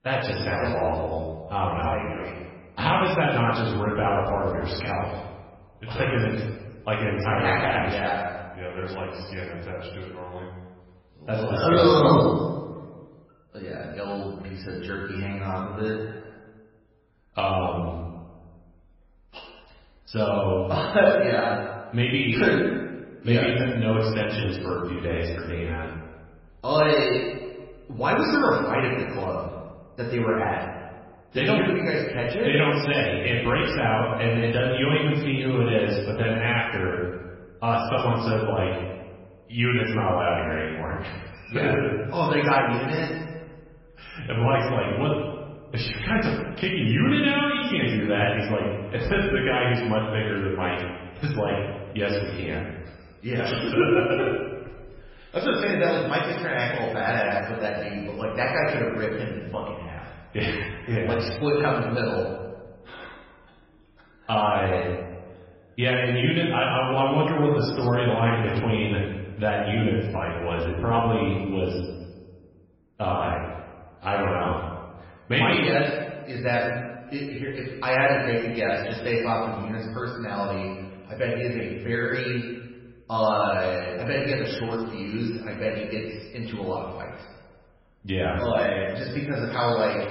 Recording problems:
off-mic speech; far
garbled, watery; badly; nothing above 5.5 kHz
room echo; noticeable; dies away in 1.1 s

